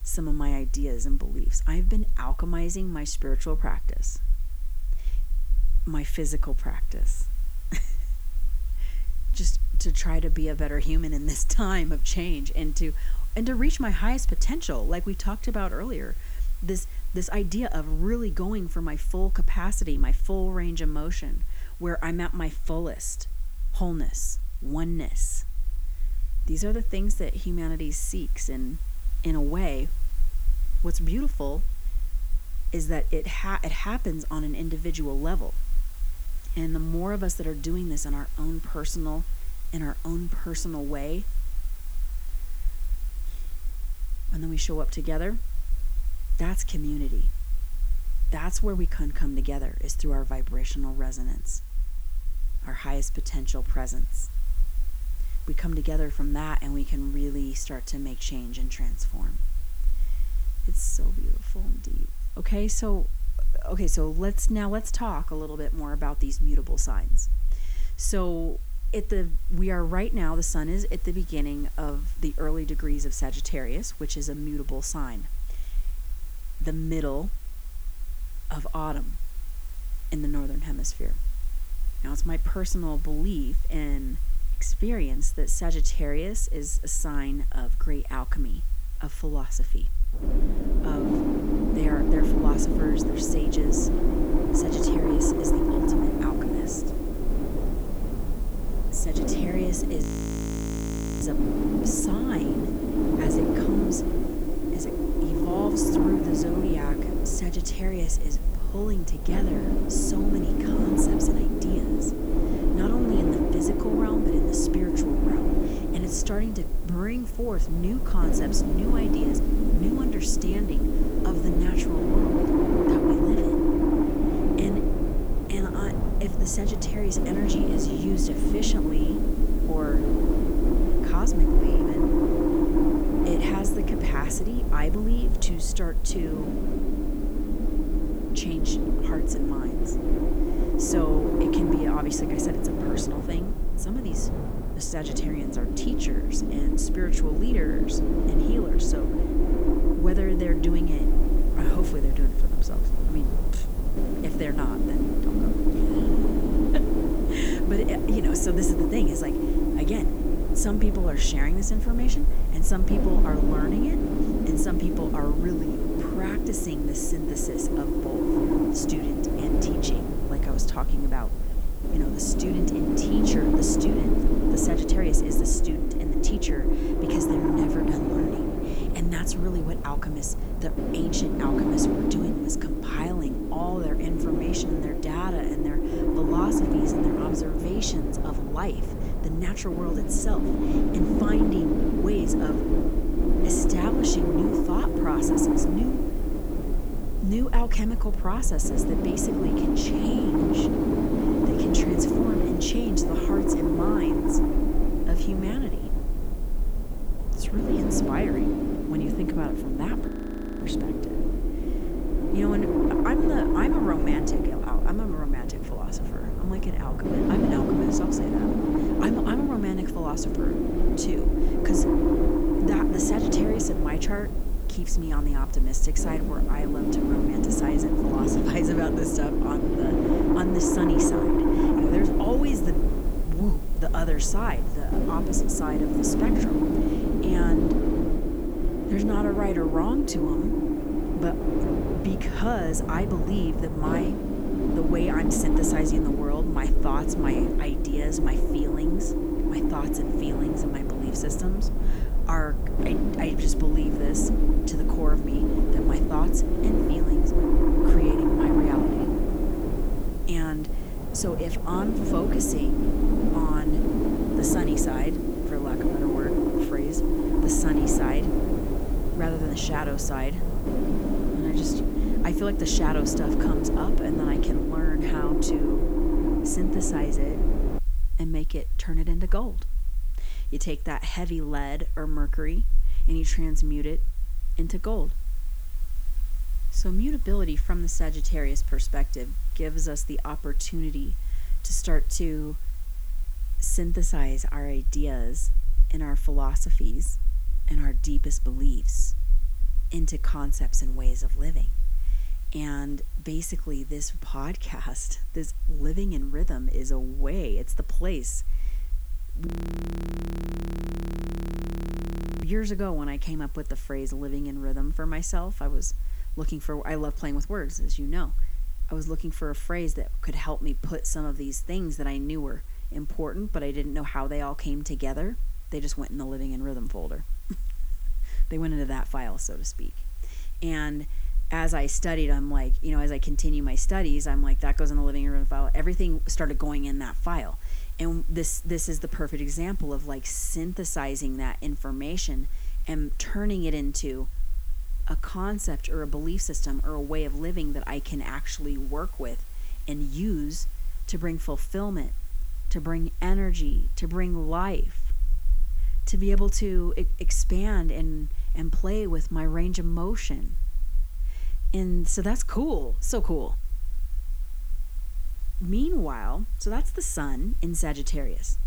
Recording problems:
wind noise on the microphone; heavy; from 1:30 to 4:38; 4 dB above the speech
hiss; noticeable; throughout; 20 dB below the speech
low rumble; faint; throughout; 25 dB below the speech
audio freezing; at 1:40 for 1 s, at 3:30 for 0.5 s and at 5:09 for 3 s

